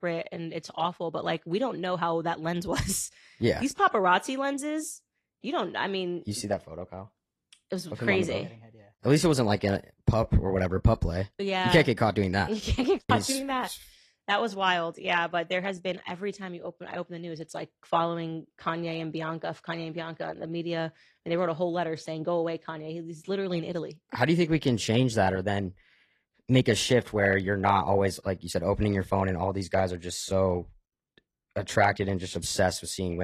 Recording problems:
garbled, watery; slightly; nothing above 13.5 kHz
abrupt cut into speech; at the end

